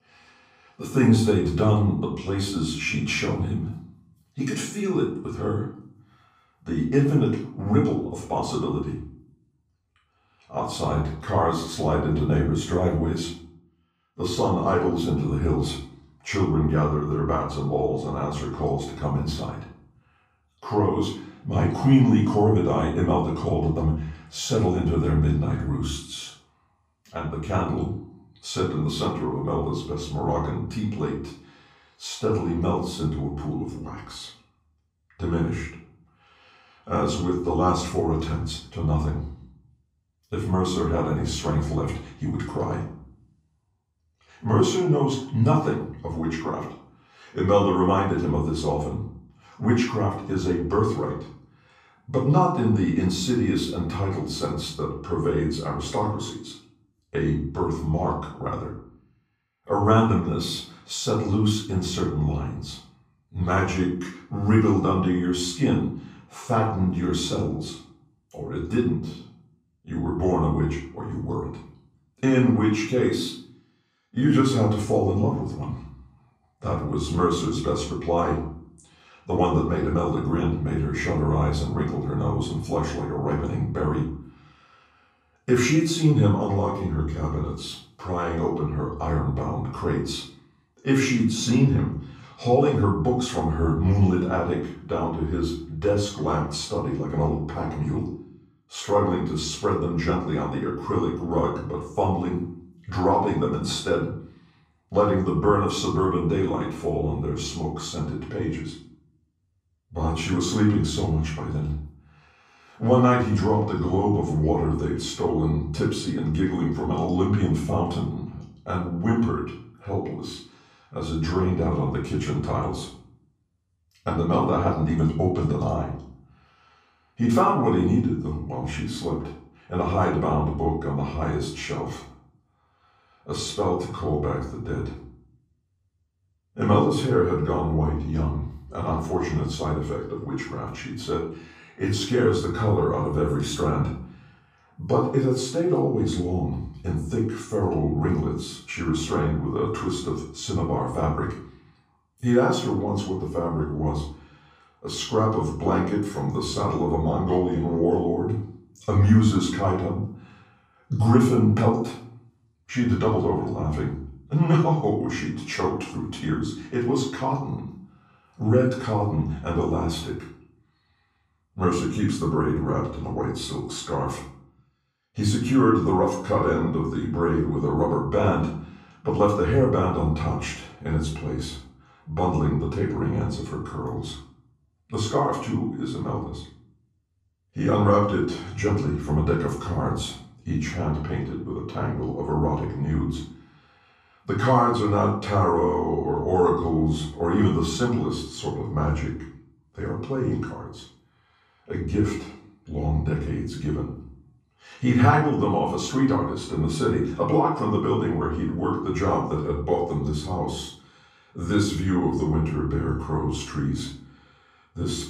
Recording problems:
off-mic speech; far
room echo; noticeable; dies away in 0.5 s

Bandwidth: 15.5 kHz